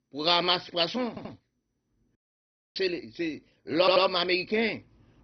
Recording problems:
garbled, watery; badly; nothing above 5 kHz
audio stuttering; at 1 s and at 4 s
audio cutting out; at 2 s for 0.5 s

